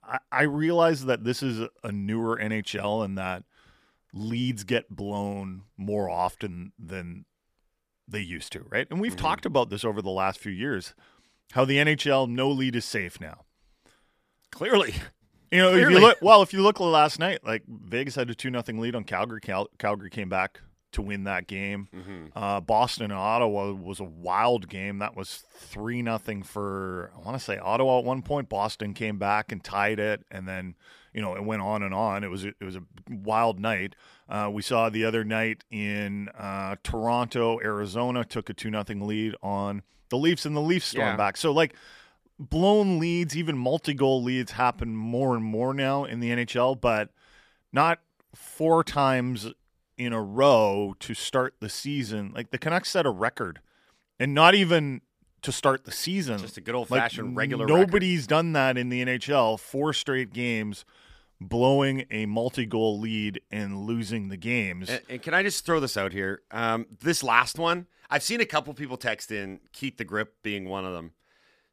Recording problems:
none

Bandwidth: 14.5 kHz